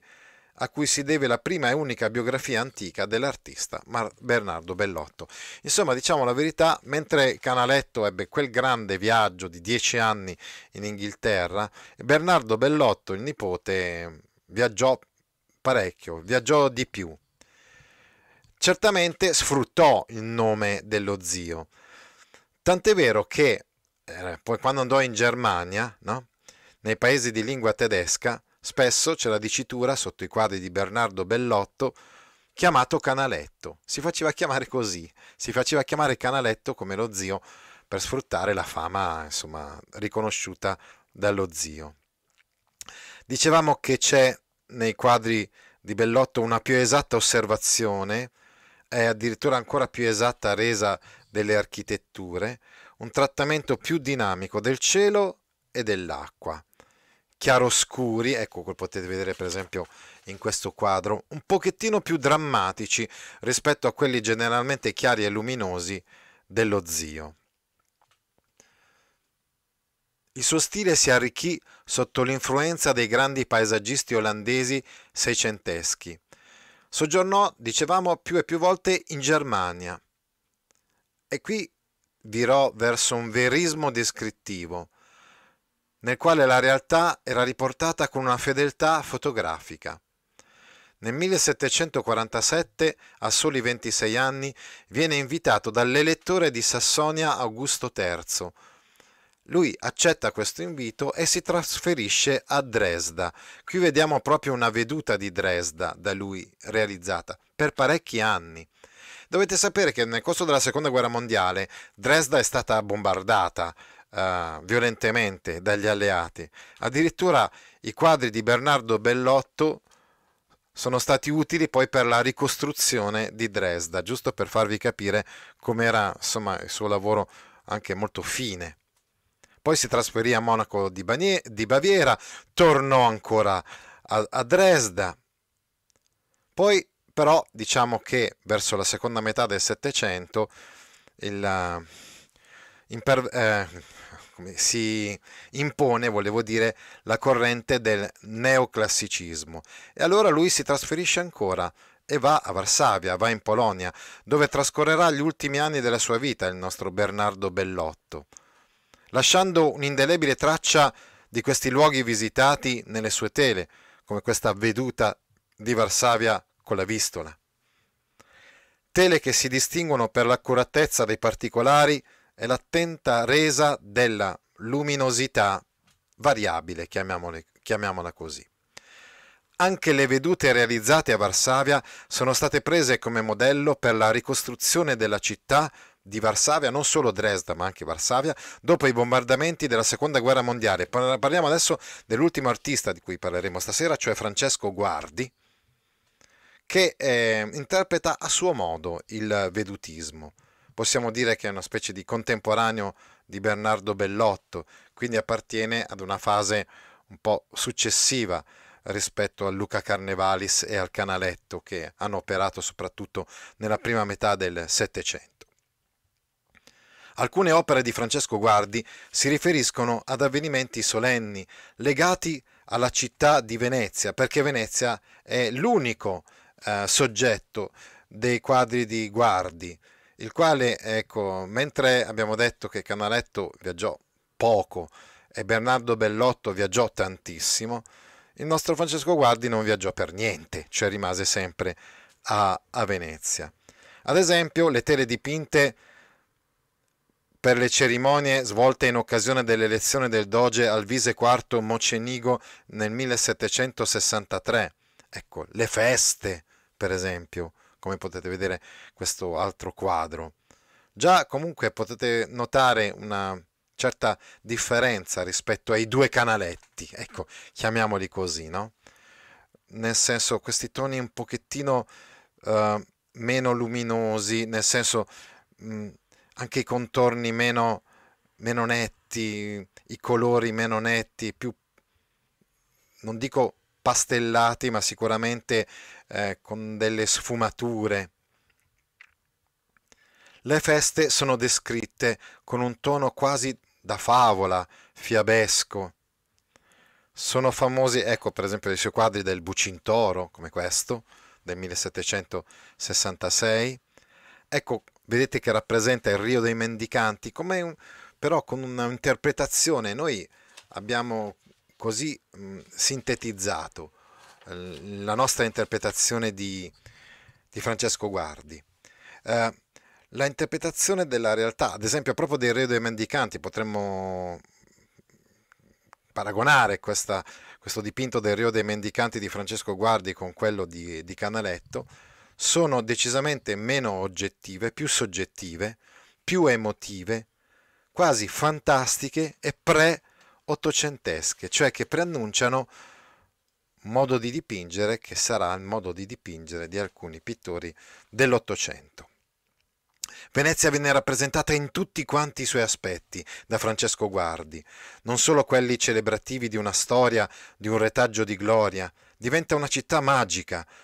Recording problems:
none

